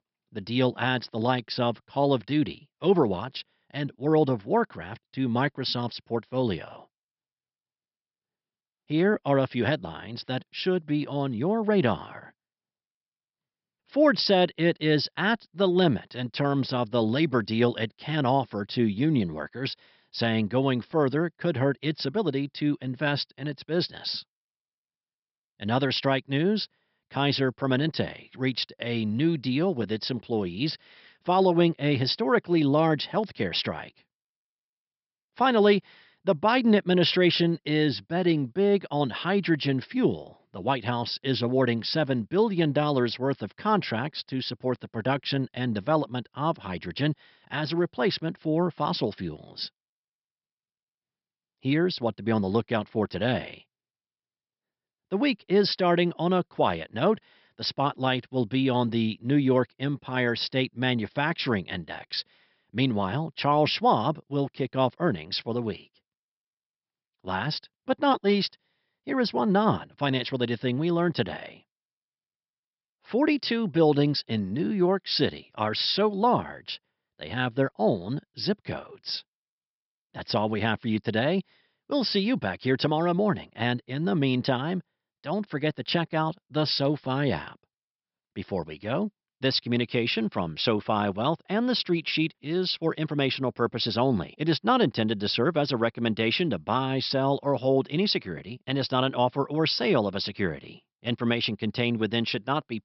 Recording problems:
high frequencies cut off; noticeable; nothing above 5.5 kHz

